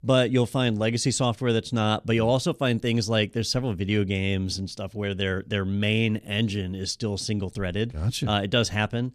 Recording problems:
none

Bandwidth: 14 kHz